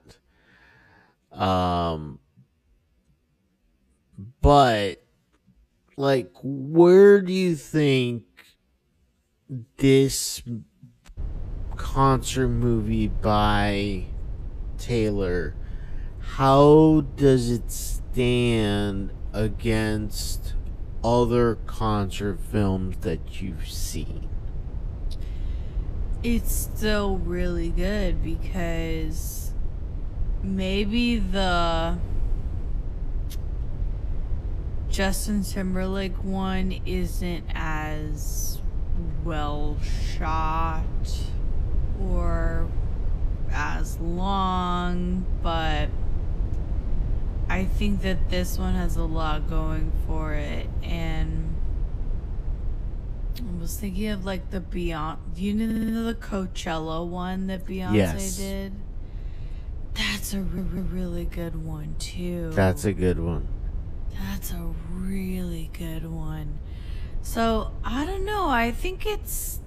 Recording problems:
wrong speed, natural pitch; too slow; 0.6 times normal speed
low rumble; faint; from 11 s on; 20 dB below the speech
audio stuttering; at 56 s and at 1:00

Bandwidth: 14.5 kHz